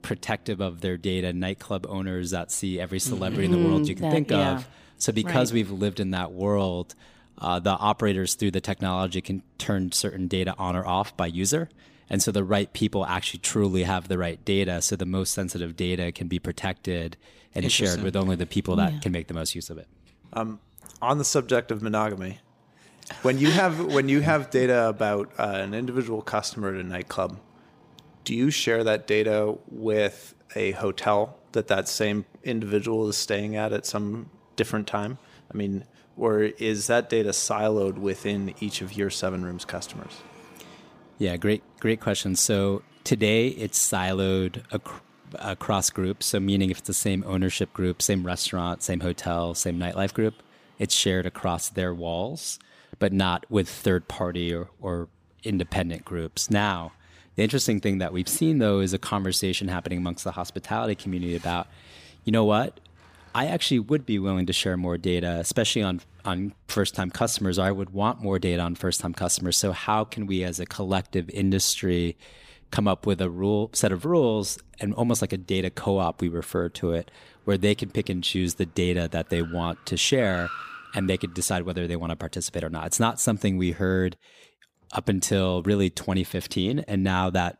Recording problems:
traffic noise; faint; throughout; 25 dB below the speech

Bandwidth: 15 kHz